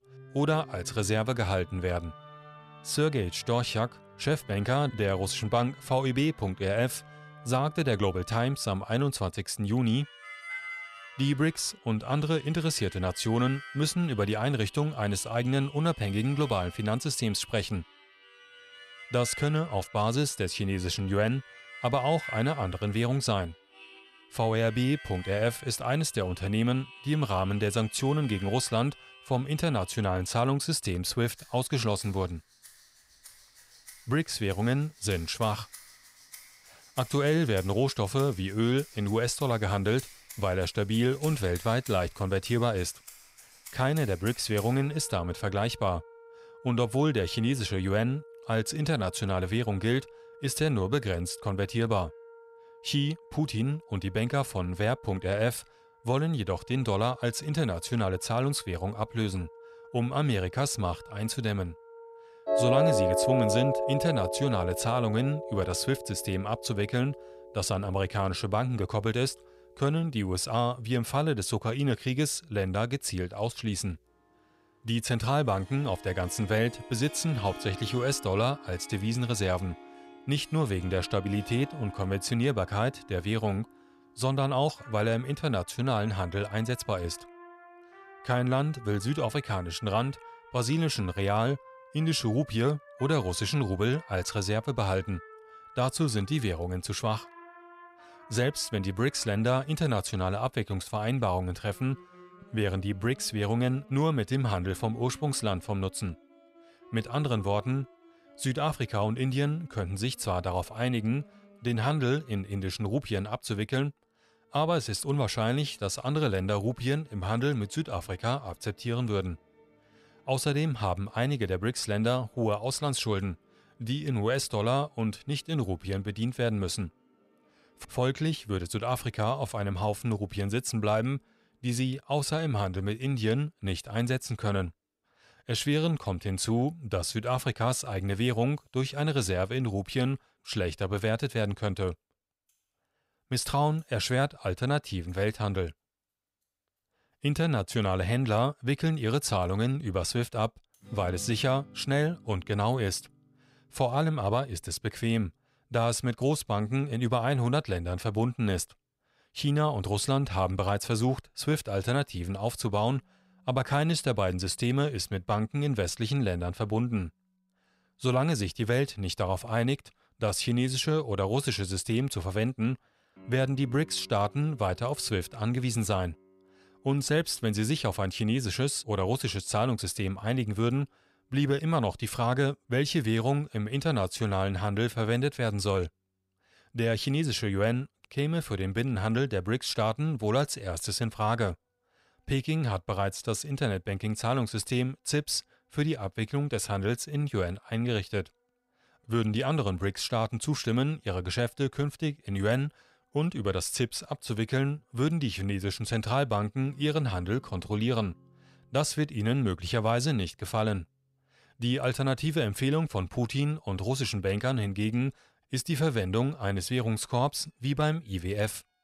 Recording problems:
background music; noticeable; throughout; 15 dB below the speech

